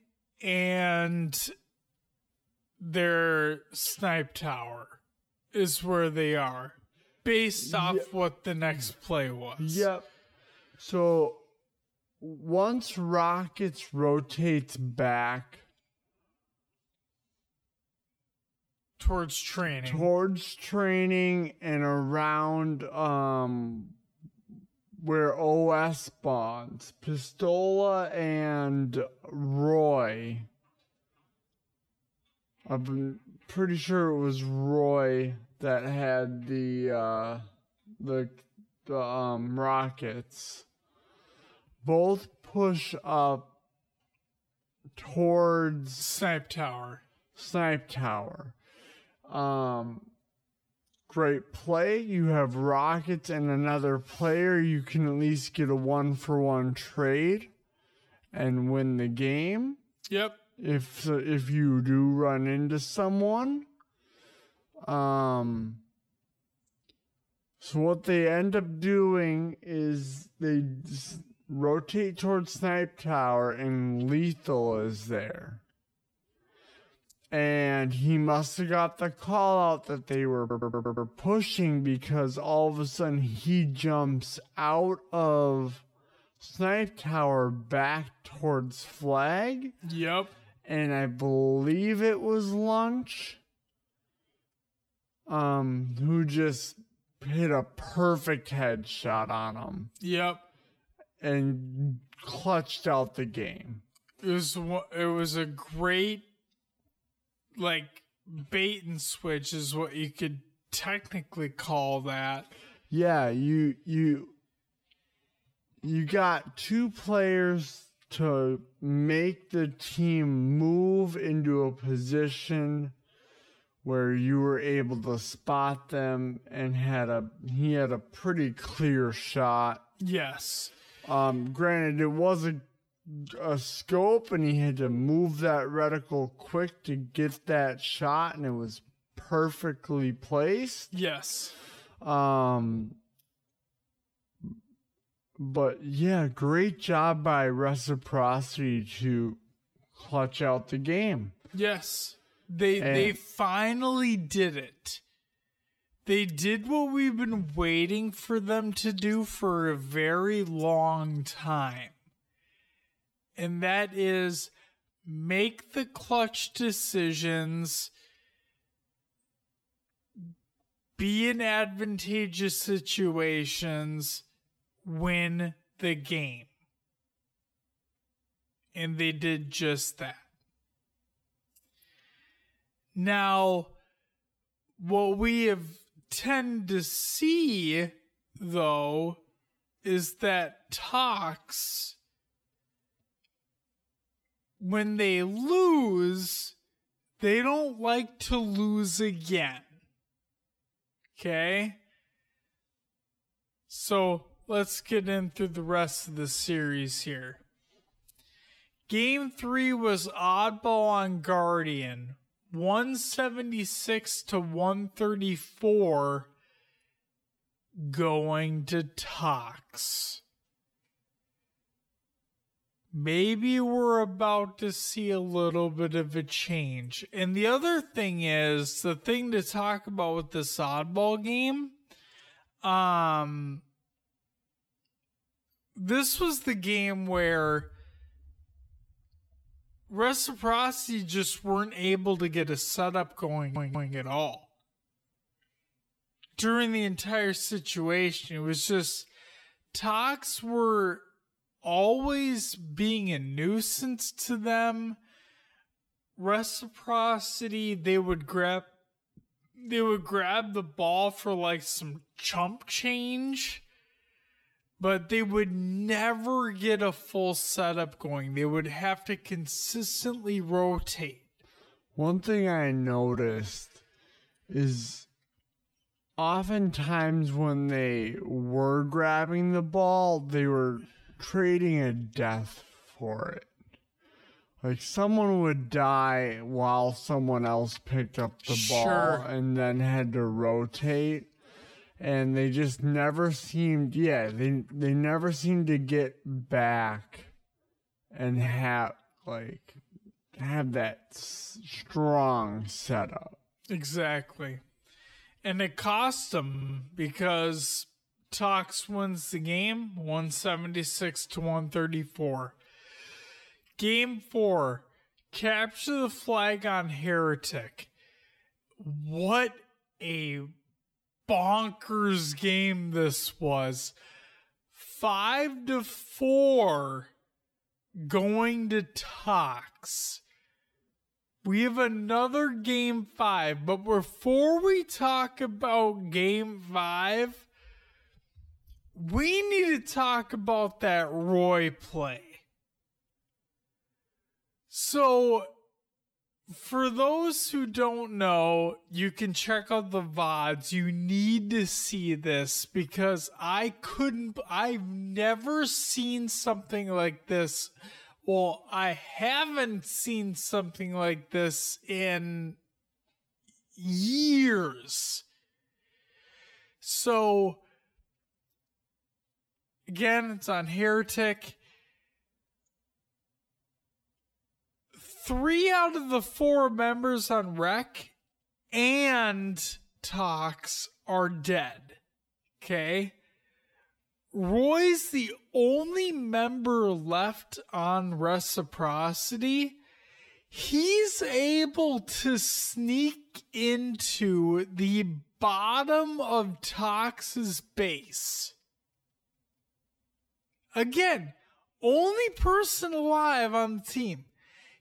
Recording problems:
wrong speed, natural pitch; too slow; 0.5 times normal speed
audio stuttering; at 1:20, at 4:03 and at 5:06

